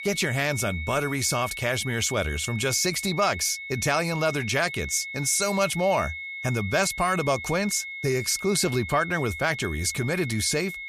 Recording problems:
high-pitched whine; loud; throughout; 2 kHz, 9 dB below the speech

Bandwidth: 14.5 kHz